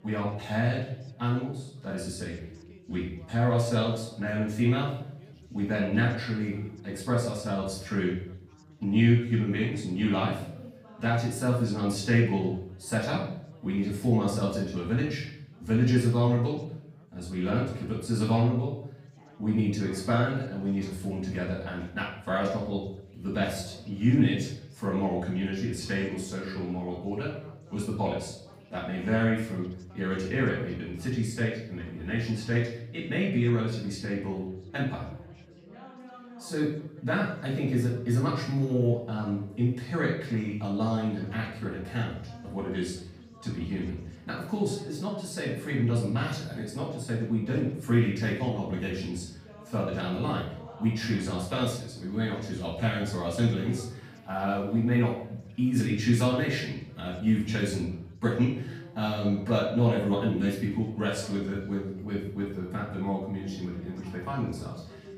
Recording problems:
off-mic speech; far
room echo; noticeable; dies away in 0.6 s
background chatter; faint; throughout; 3 voices, 25 dB below the speech

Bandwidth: 15.5 kHz